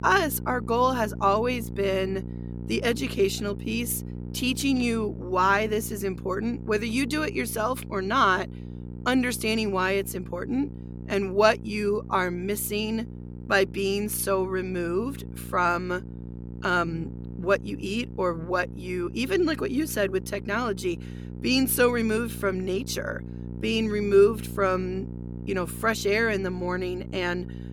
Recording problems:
electrical hum; noticeable; throughout; 60 Hz, 20 dB below the speech

